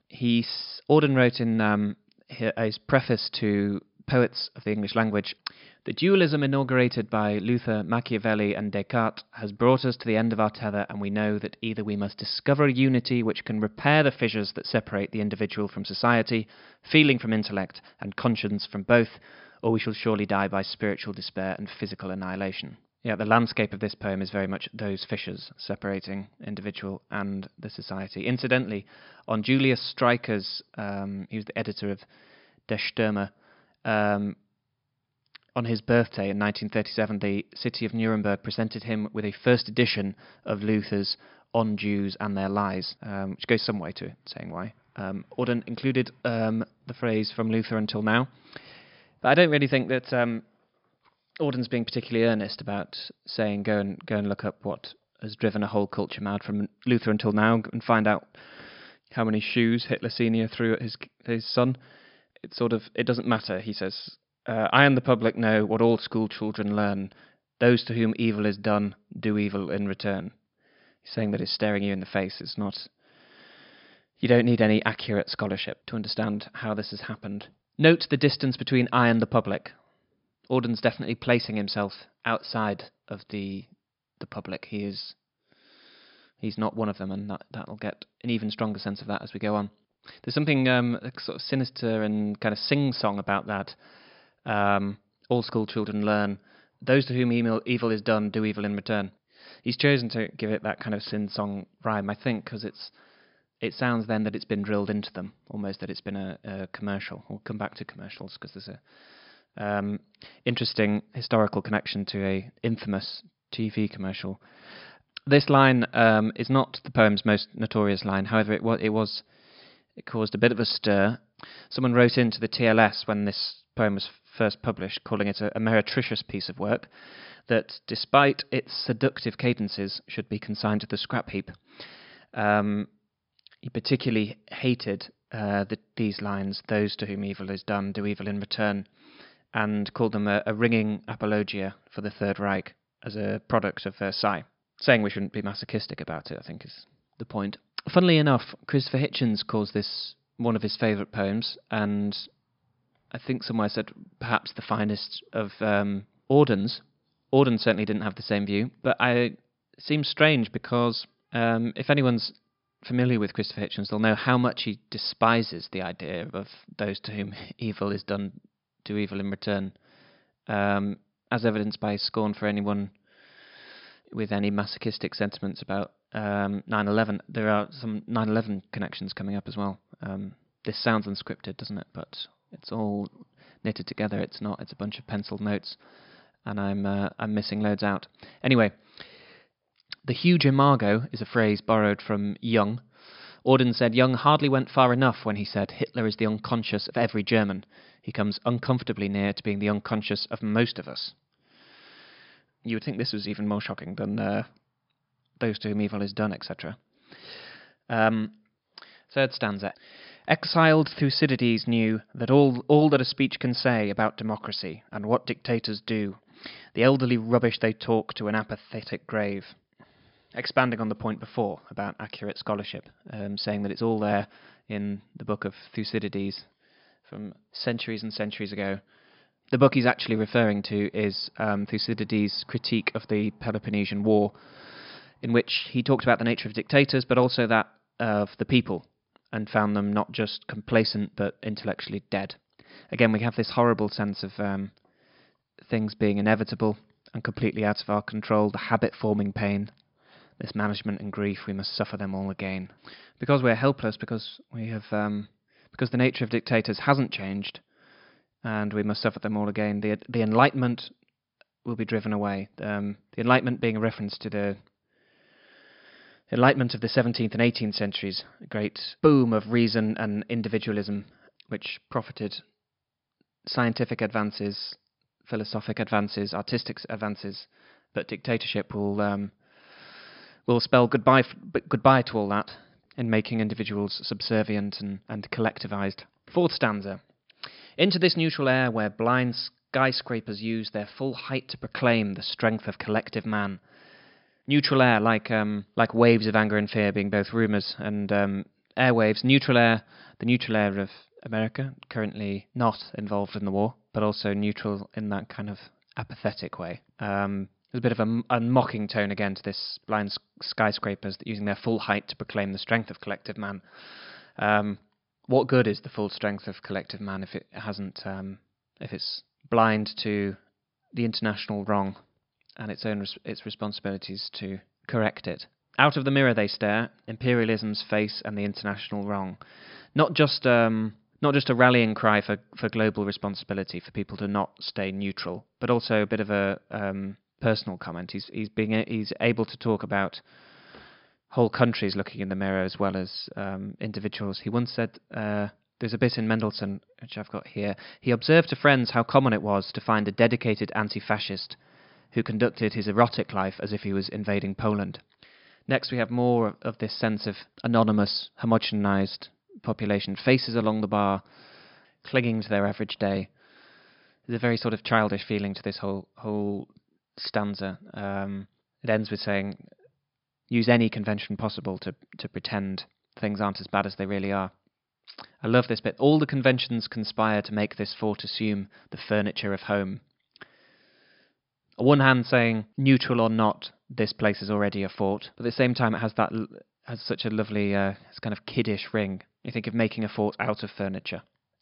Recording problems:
high frequencies cut off; noticeable; nothing above 5.5 kHz

